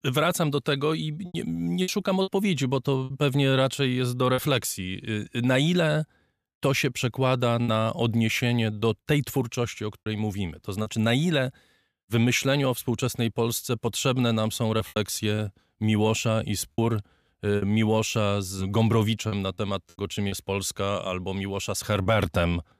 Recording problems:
choppy; occasionally; 5% of the speech affected

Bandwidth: 14.5 kHz